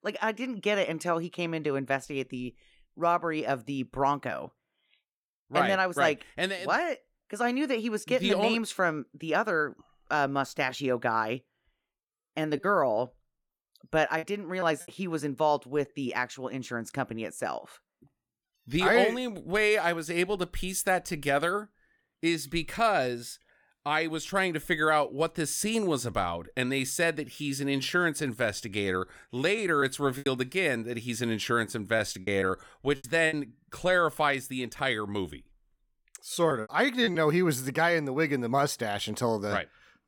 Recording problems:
choppy; very; from 13 to 15 s, from 30 to 33 s and at 37 s; 9% of the speech affected

